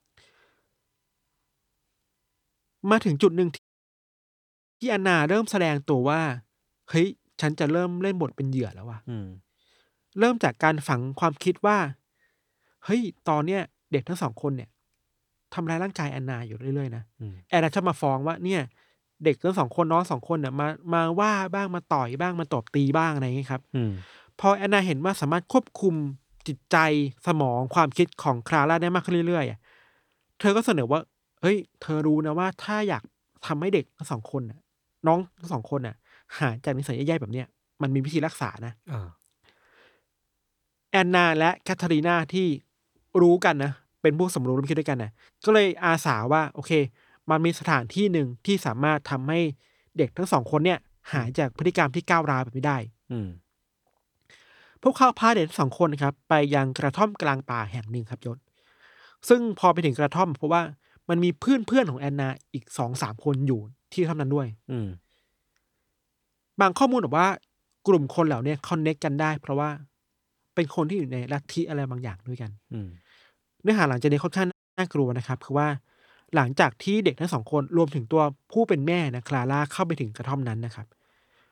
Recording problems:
audio cutting out; at 3.5 s for 1 s and at 1:15

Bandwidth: 18.5 kHz